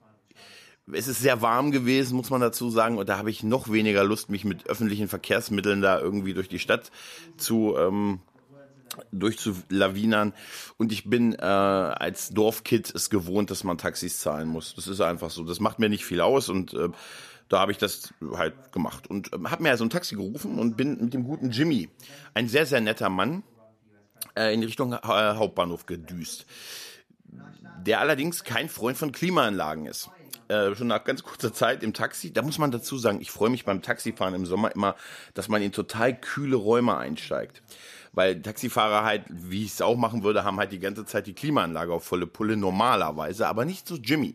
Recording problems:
voice in the background; faint; throughout; 30 dB below the speech

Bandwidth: 14.5 kHz